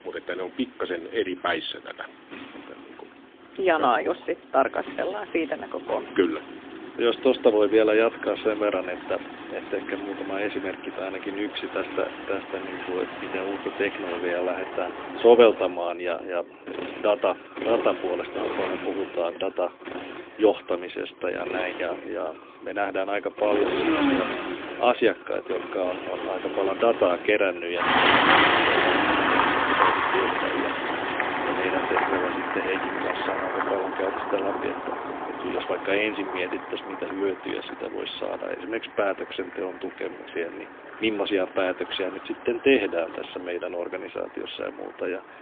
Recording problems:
phone-call audio; poor line; nothing above 3.5 kHz
traffic noise; loud; throughout; 1 dB below the speech

